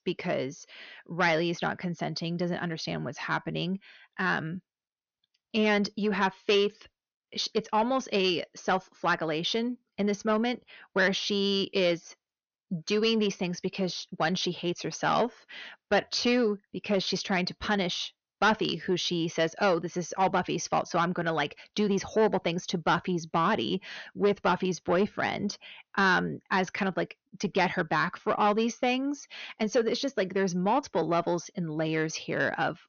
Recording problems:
high frequencies cut off; noticeable; nothing above 6.5 kHz
distortion; slight; 10 dB below the speech

